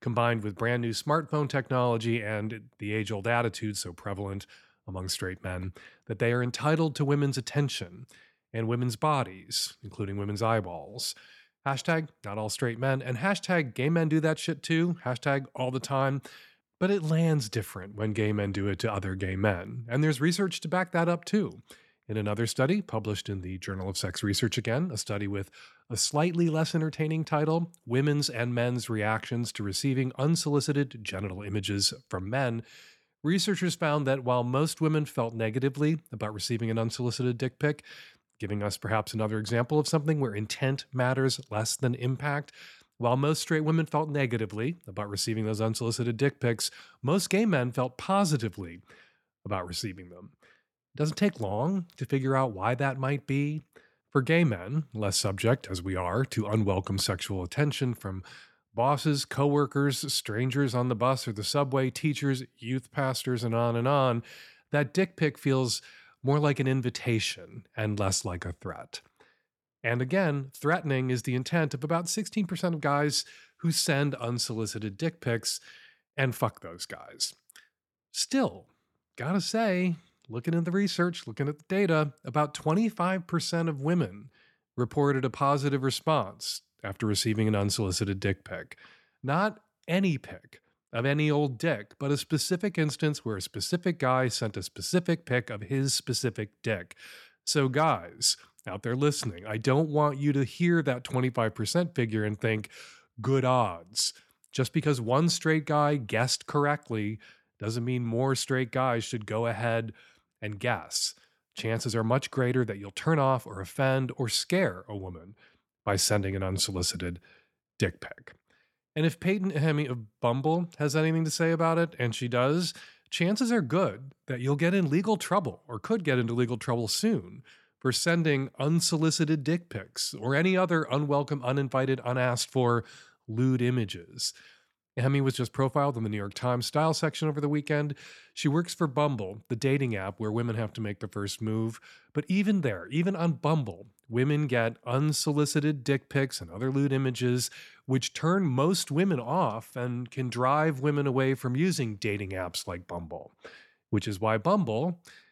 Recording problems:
none

